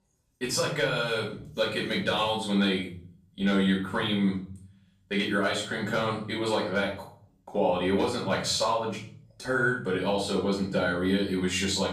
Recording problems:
off-mic speech; far
room echo; noticeable; dies away in 0.5 s

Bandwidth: 15 kHz